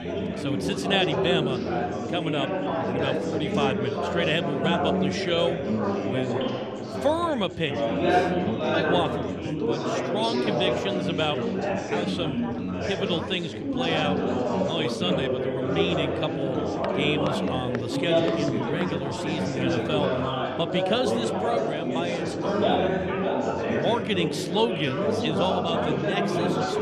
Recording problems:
chatter from many people; very loud; throughout; 2 dB above the speech
footsteps; noticeable; from 17 to 19 s; peak 9 dB below the speech

